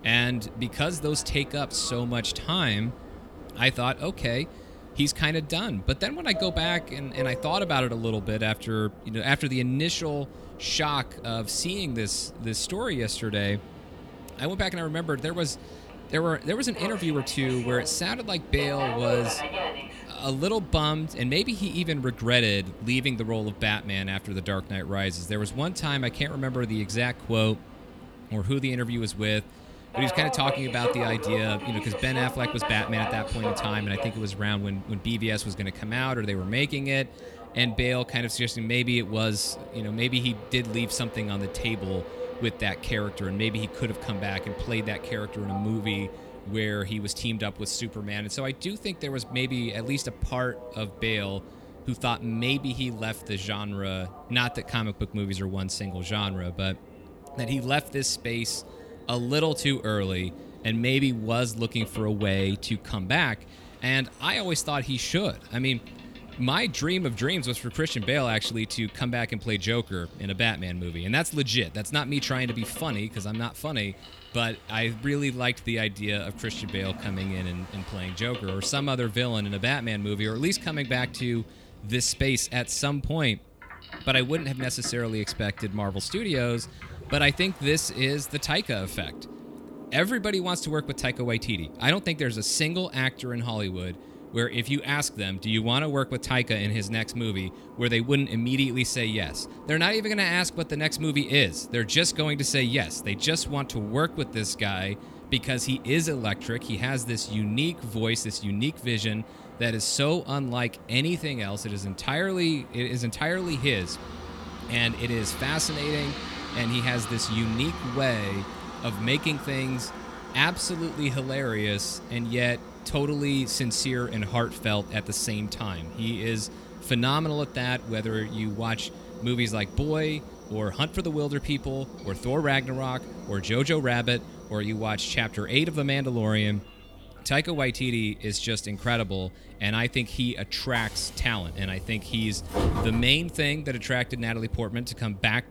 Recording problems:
train or aircraft noise; noticeable; throughout; 15 dB below the speech

